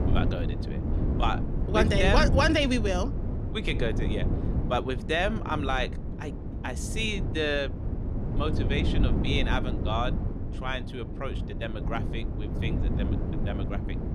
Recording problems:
wind noise on the microphone; heavy; 10 dB below the speech

